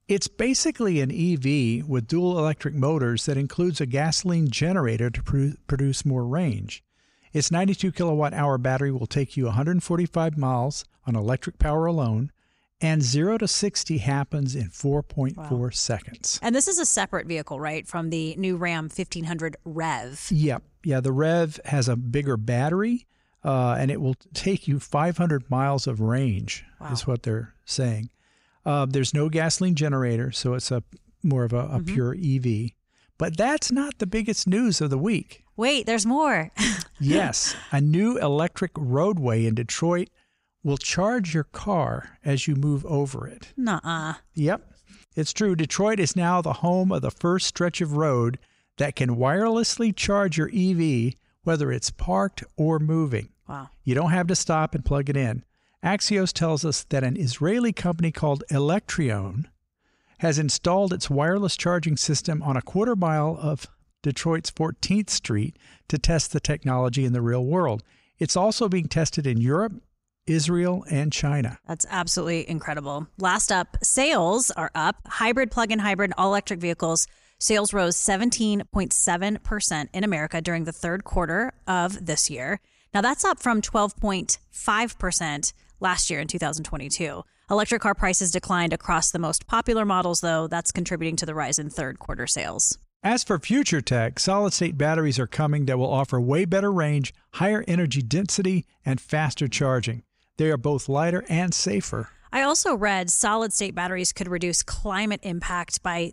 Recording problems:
none

